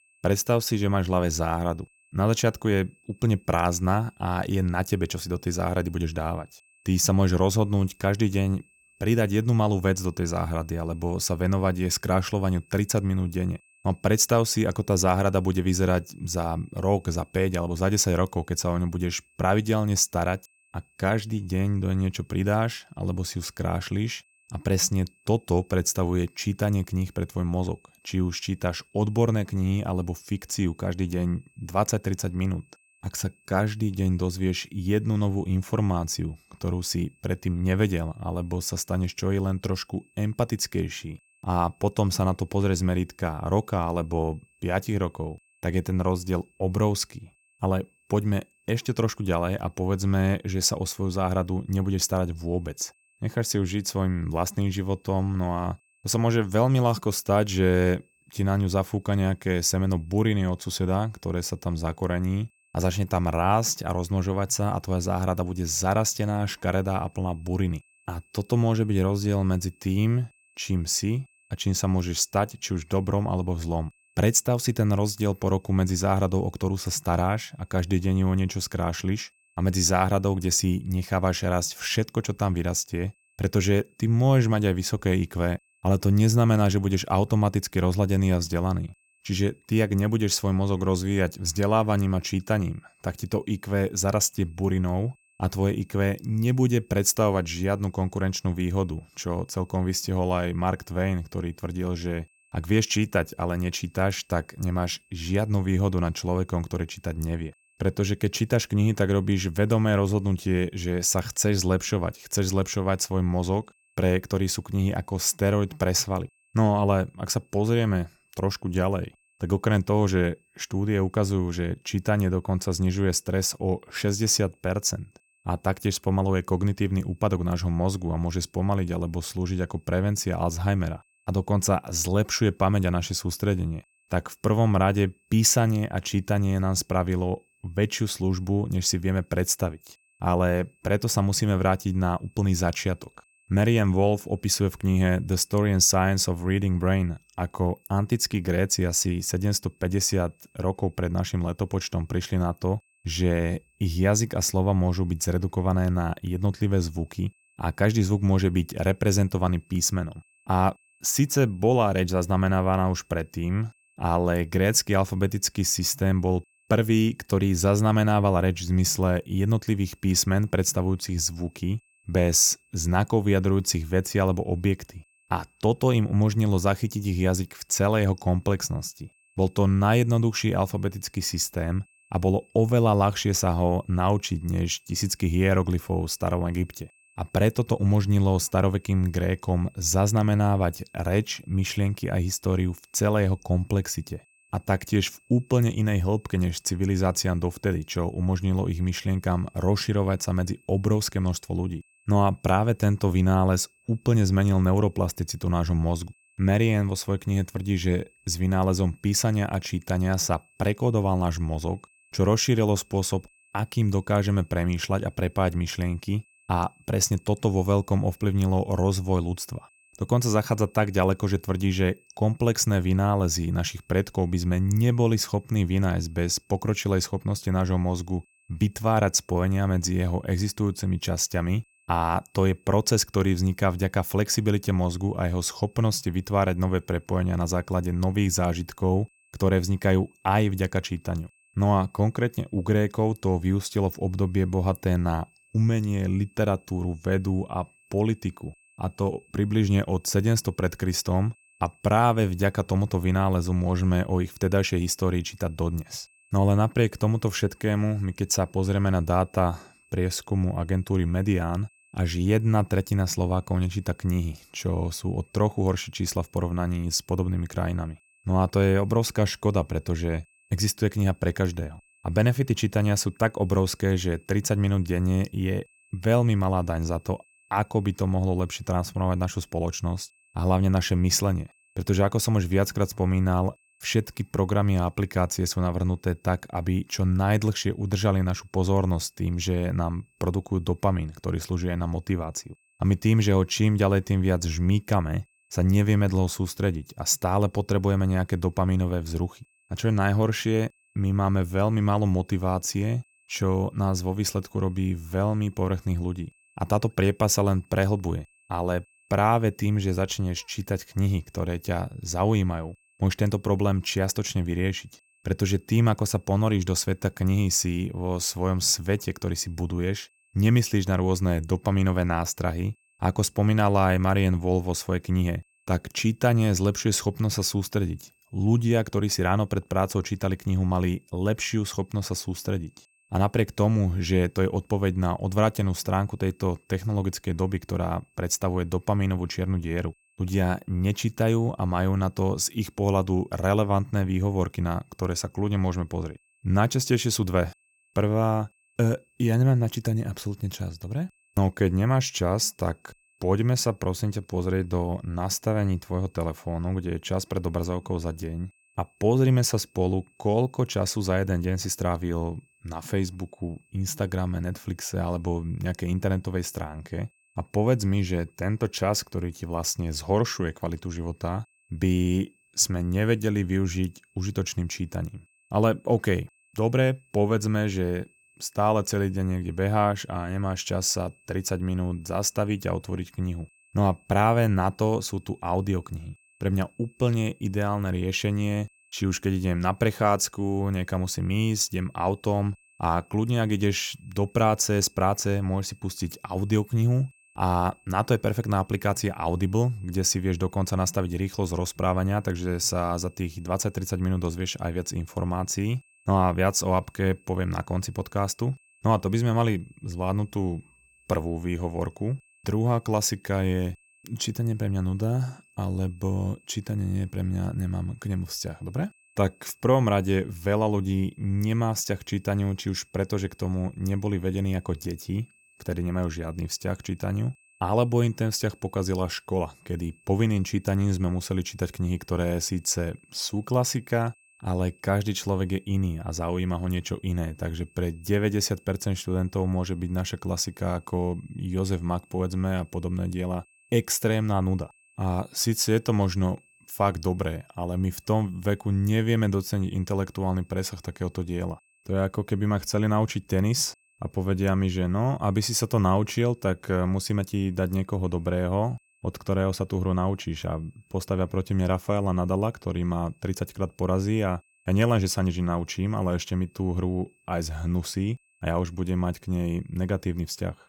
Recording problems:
high-pitched whine; faint; throughout; 2.5 kHz, 35 dB below the speech

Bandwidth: 17.5 kHz